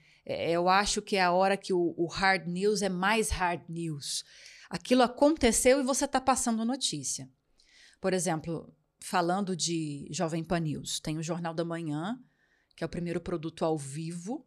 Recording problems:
none

